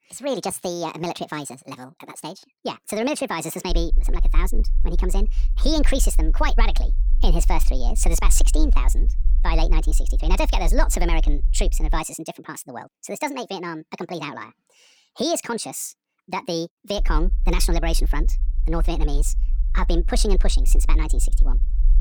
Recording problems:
wrong speed and pitch; too fast and too high; 1.6 times normal speed
low rumble; faint; from 3.5 to 12 s and from 17 s on; 20 dB below the speech

